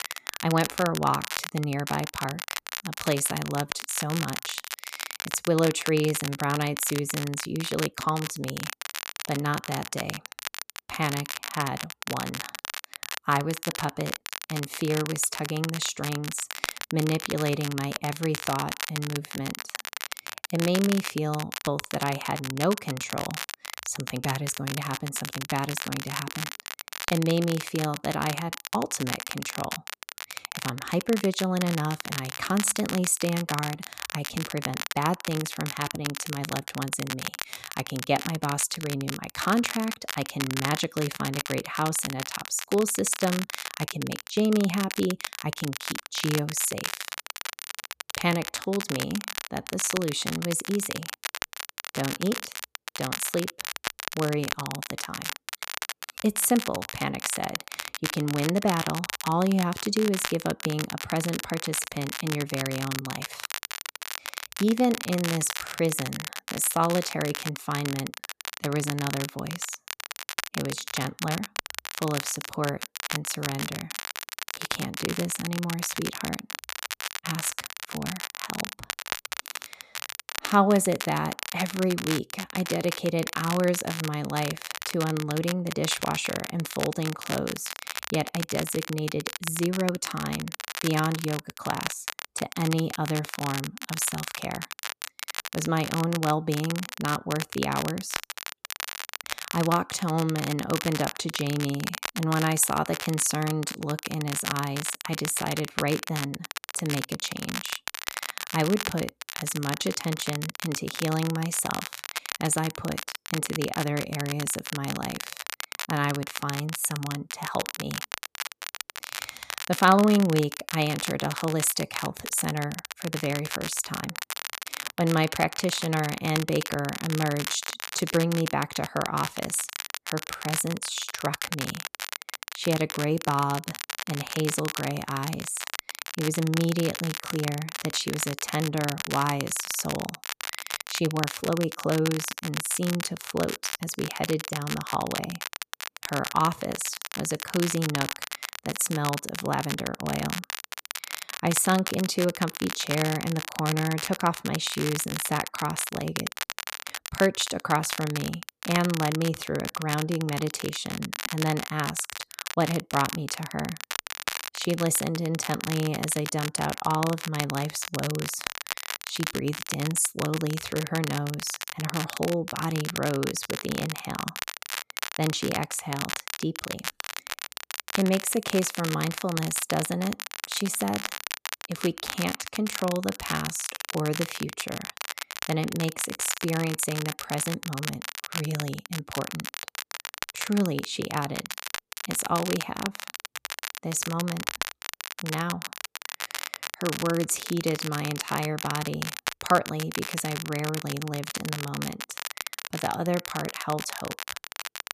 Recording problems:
crackle, like an old record; loud; 5 dB below the speech

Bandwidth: 14.5 kHz